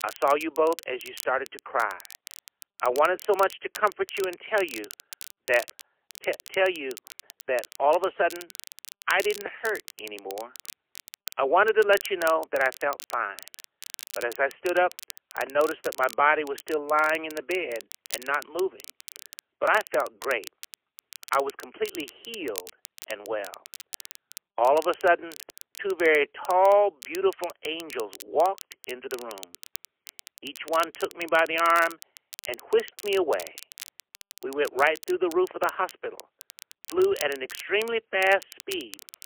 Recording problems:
phone-call audio; poor line; nothing above 3 kHz
crackle, like an old record; noticeable; 15 dB below the speech

